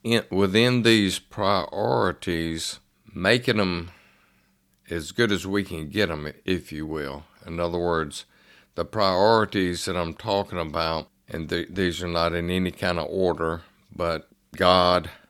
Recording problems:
none

